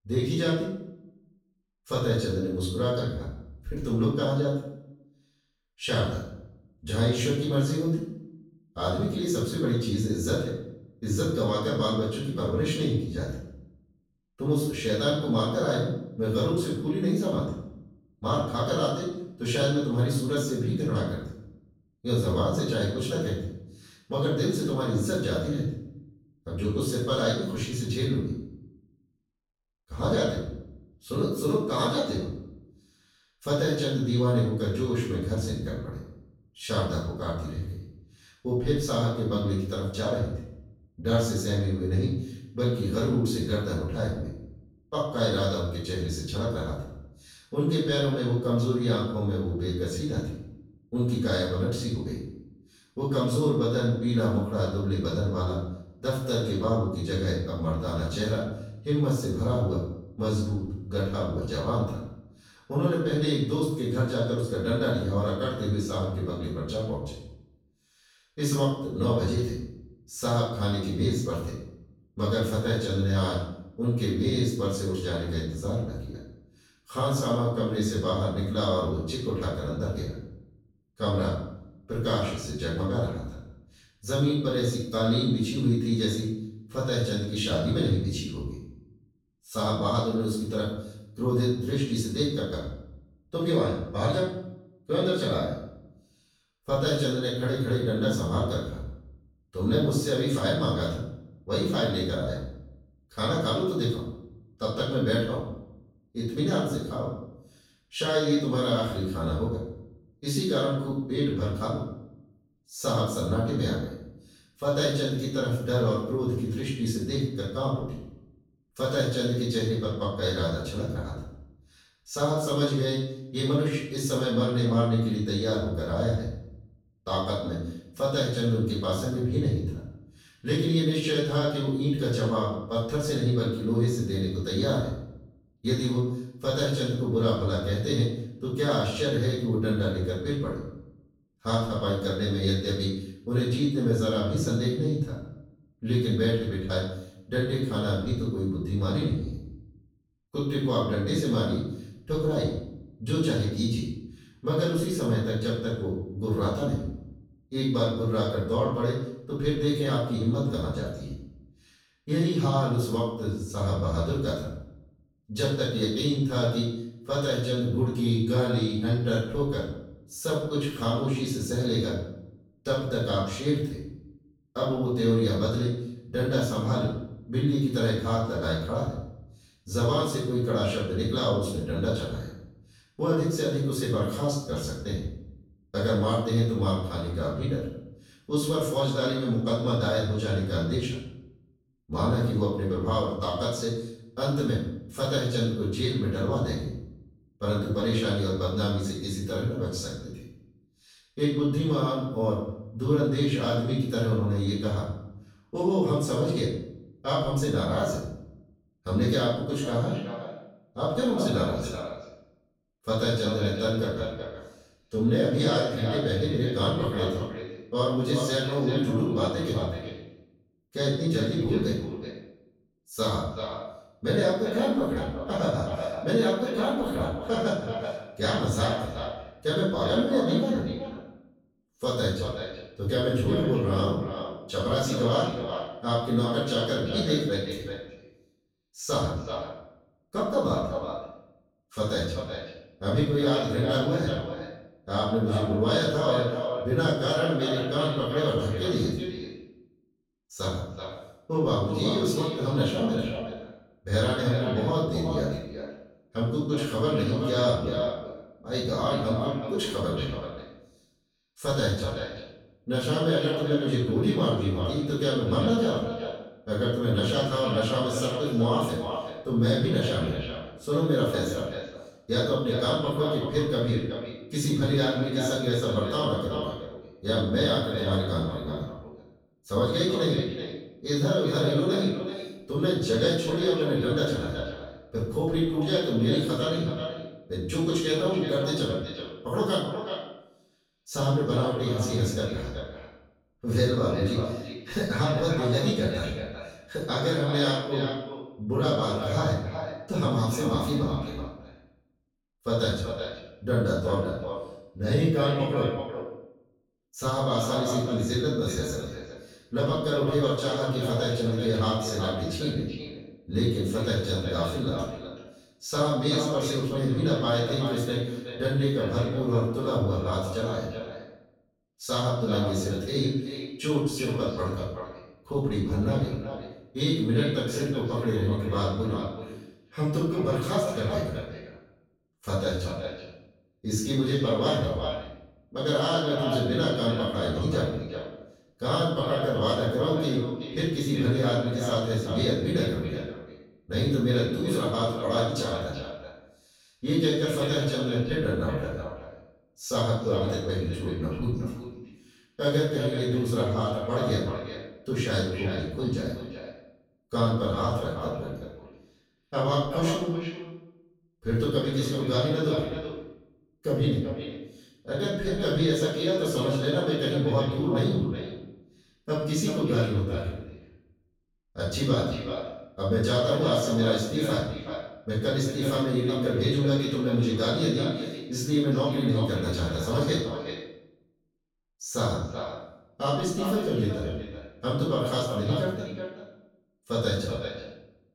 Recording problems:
echo of what is said; strong; from 3:30 on; 380 ms later, 9 dB below the speech
off-mic speech; far
room echo; noticeable; dies away in 0.7 s

